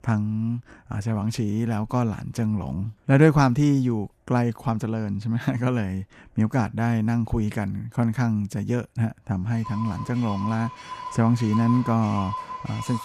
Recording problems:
household noises; noticeable; from 9.5 s on; 10 dB below the speech

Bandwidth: 14.5 kHz